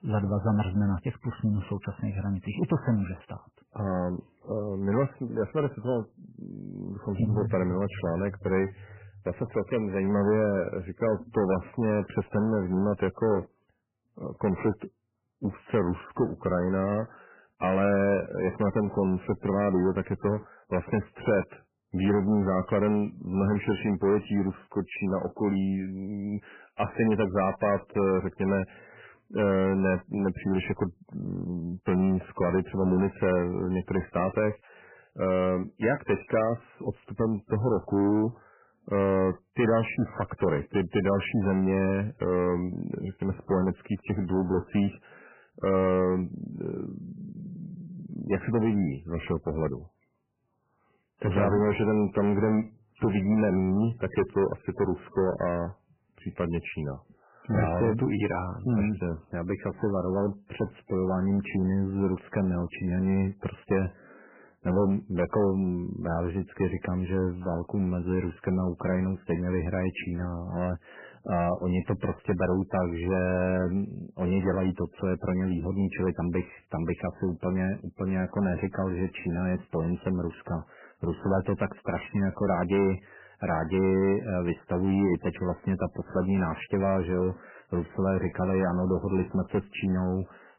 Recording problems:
garbled, watery; badly; nothing above 3 kHz
distortion; slight; 10 dB below the speech

